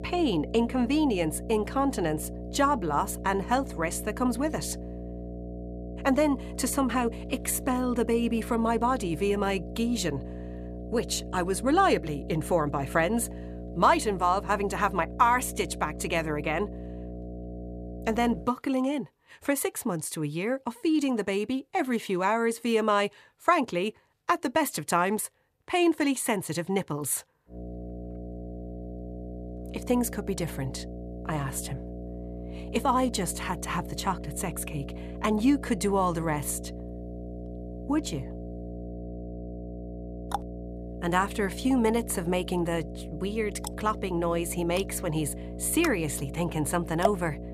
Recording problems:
electrical hum; noticeable; until 18 s and from 28 s on; 60 Hz, 15 dB below the speech

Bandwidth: 14.5 kHz